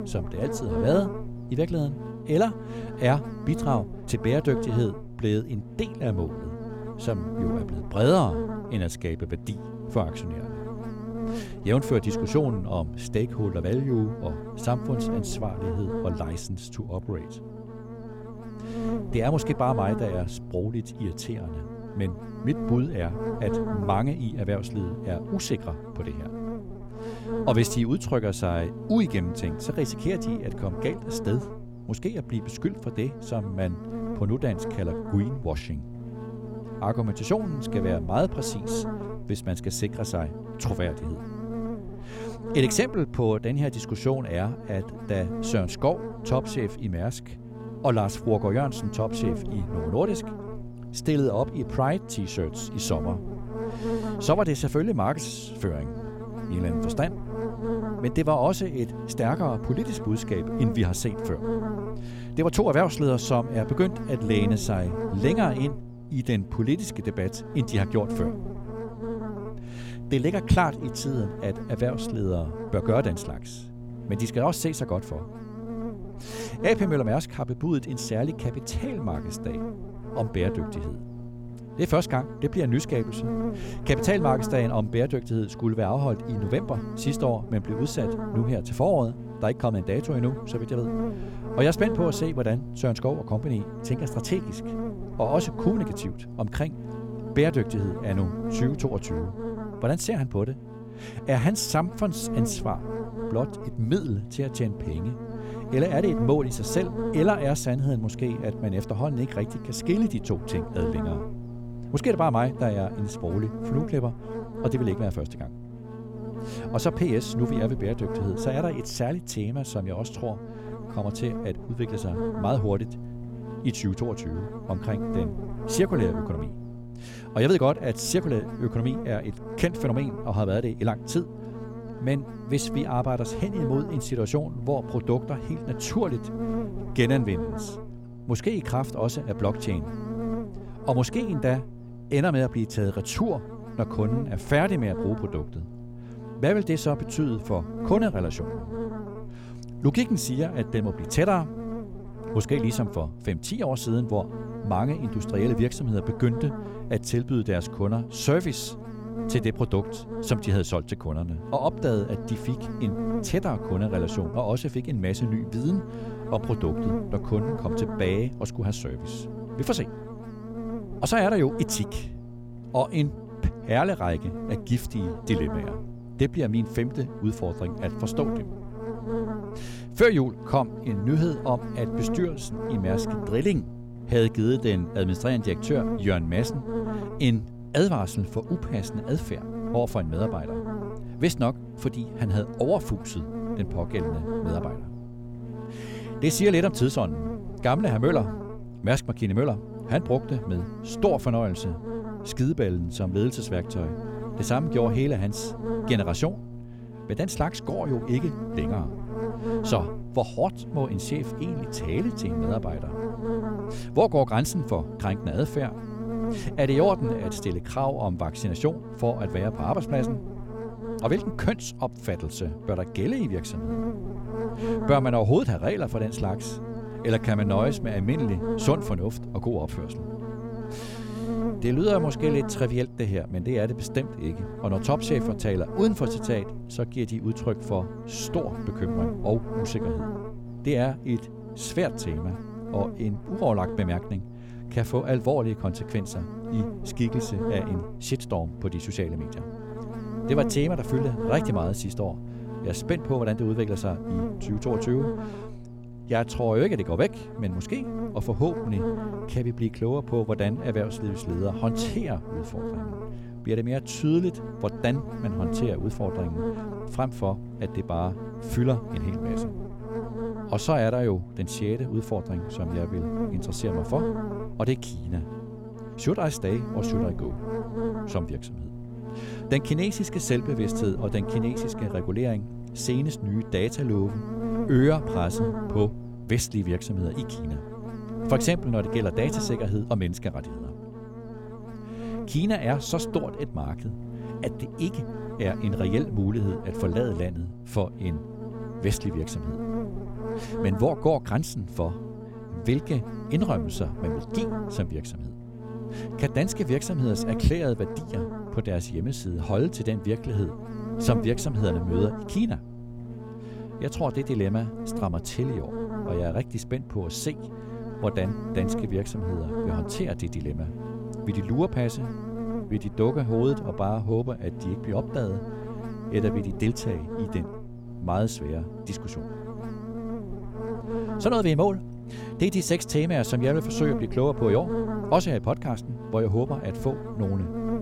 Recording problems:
electrical hum; loud; throughout; 60 Hz, 8 dB below the speech

